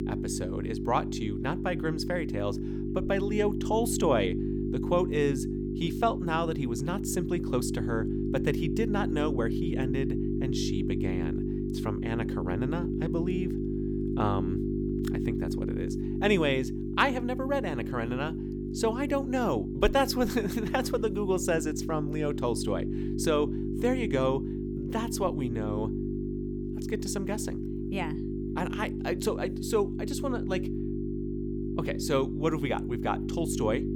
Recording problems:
electrical hum; loud; throughout; 50 Hz, 6 dB below the speech

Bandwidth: 18 kHz